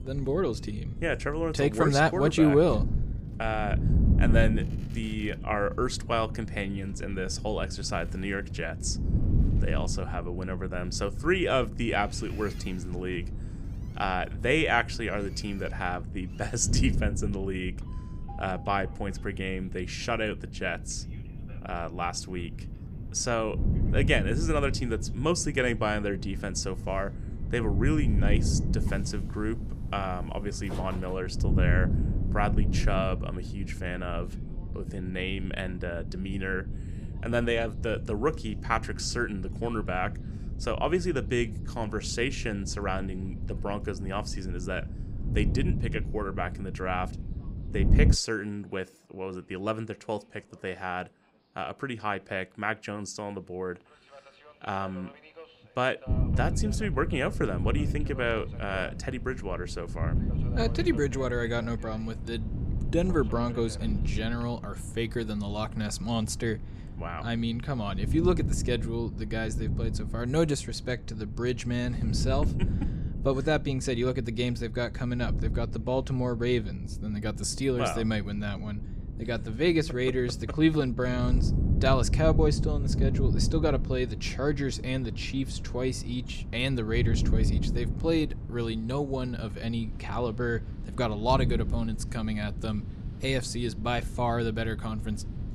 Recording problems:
wind noise on the microphone; occasional gusts; until 48 s and from 56 s on; 15 dB below the speech
train or aircraft noise; faint; throughout; 25 dB below the speech

